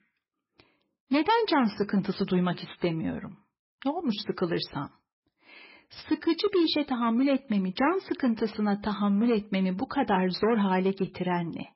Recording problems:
garbled, watery; badly; nothing above 5.5 kHz

